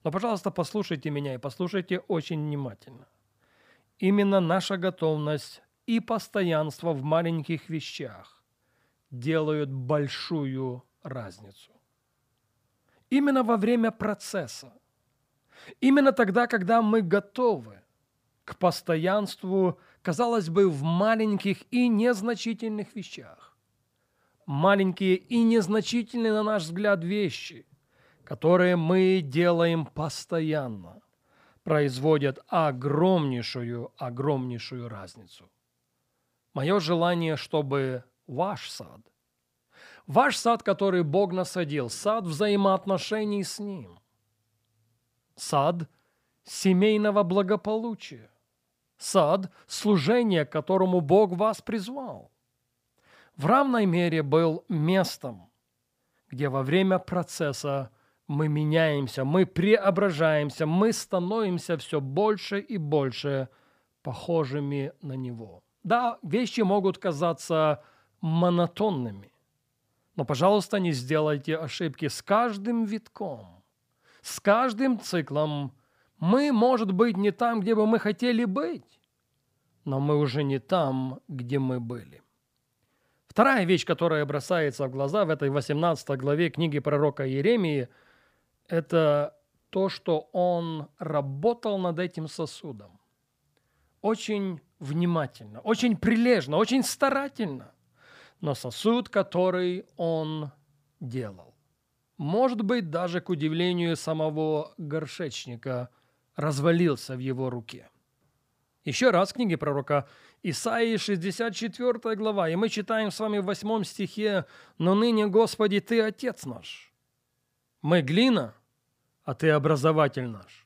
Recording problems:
none

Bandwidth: 15 kHz